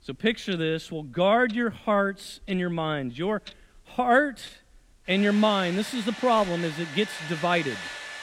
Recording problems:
household noises; noticeable; throughout; 10 dB below the speech

